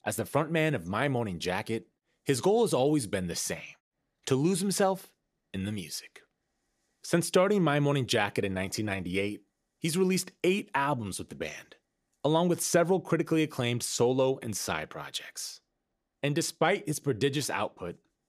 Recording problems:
none

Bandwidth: 14.5 kHz